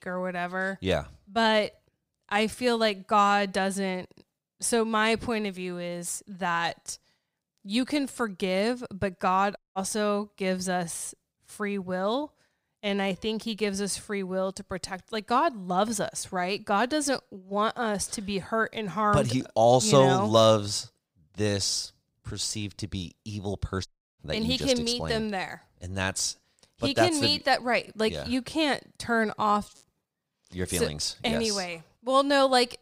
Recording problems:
audio cutting out; at 9.5 s and at 24 s

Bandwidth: 15.5 kHz